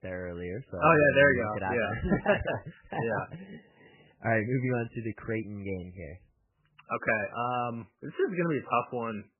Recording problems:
garbled, watery; badly; nothing above 3 kHz

